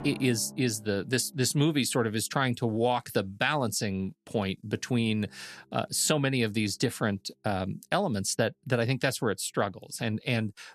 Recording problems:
background music; faint; throughout; 25 dB below the speech

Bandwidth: 13.5 kHz